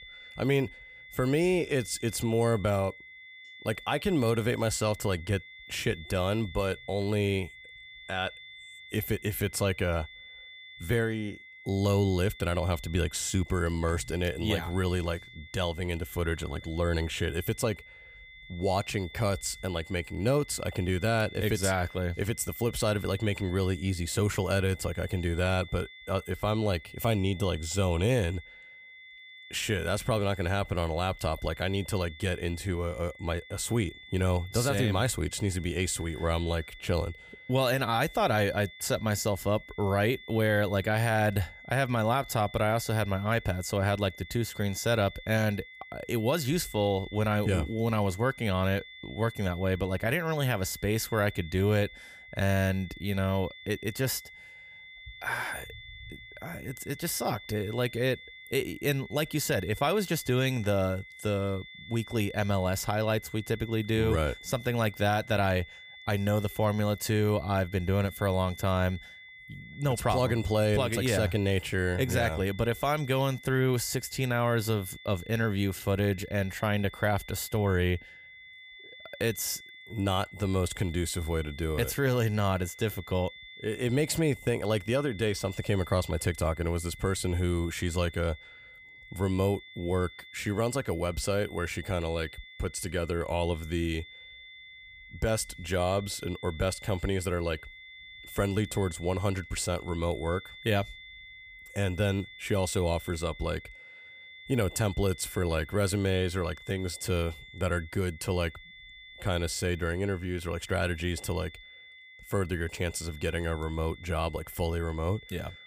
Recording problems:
high-pitched whine; noticeable; throughout; 2 kHz, 15 dB below the speech

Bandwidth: 15 kHz